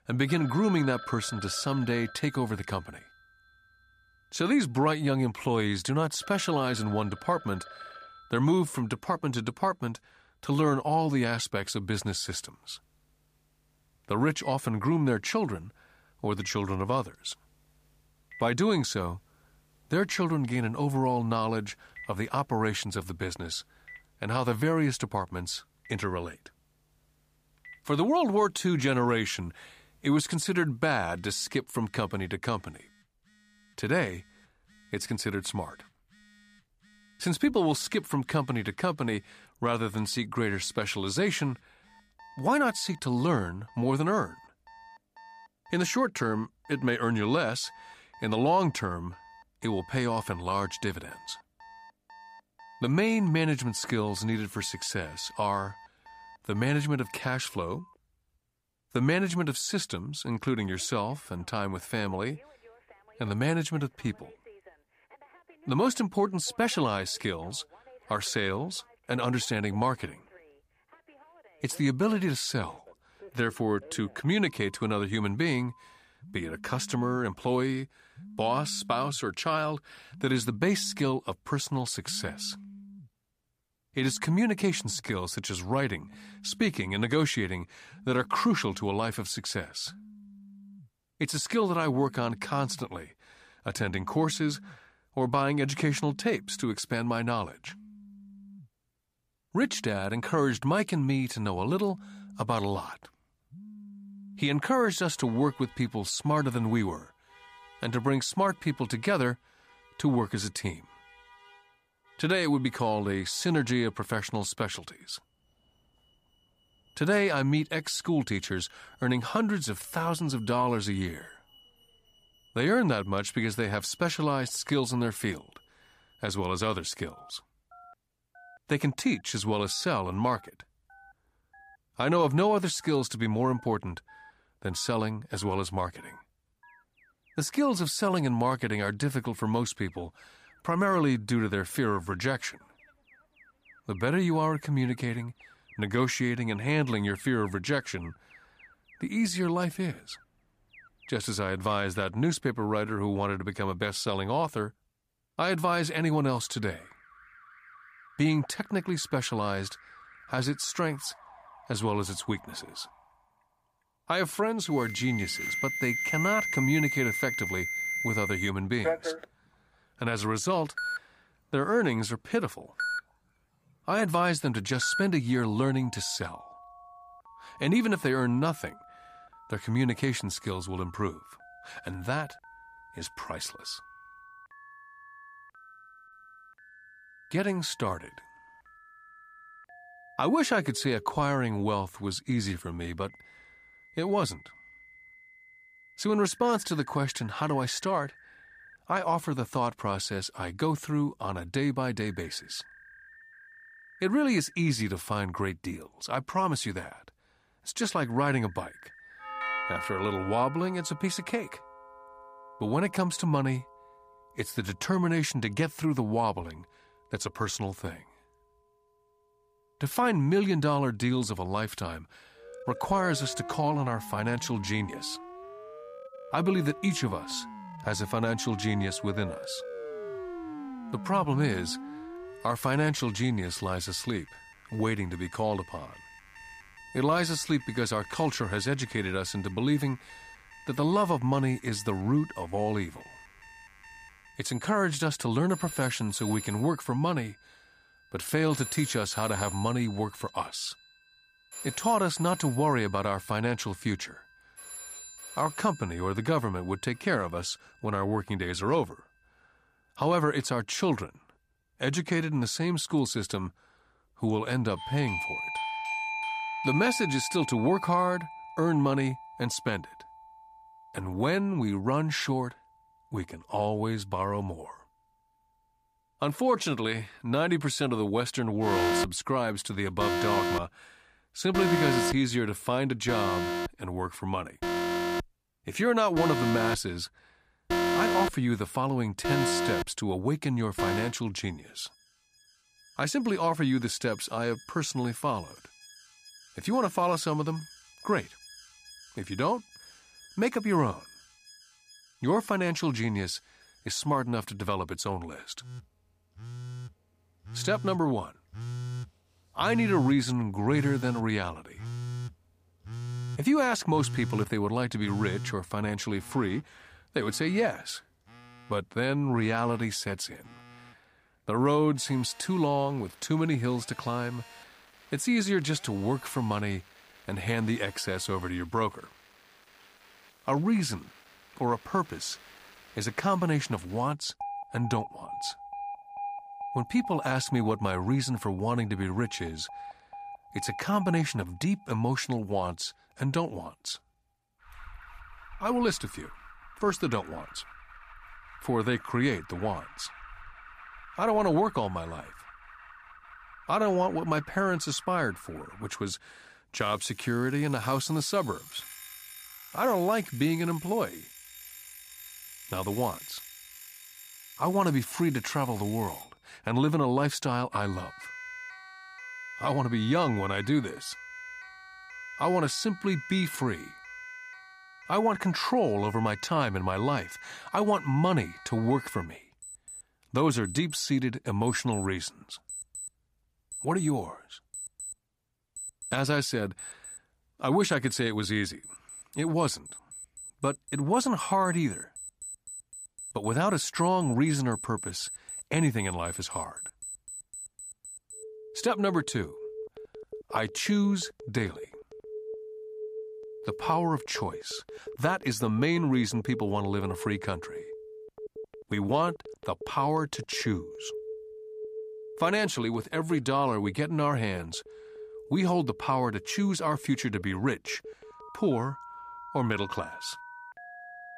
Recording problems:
alarms or sirens; noticeable; throughout; 10 dB below the speech

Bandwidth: 15 kHz